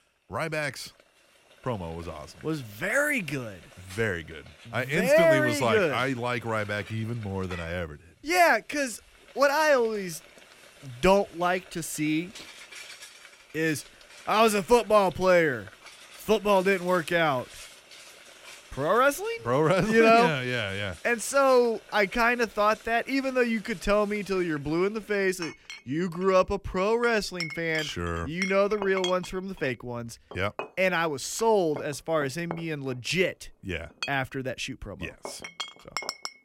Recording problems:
household noises; noticeable; throughout; 15 dB below the speech

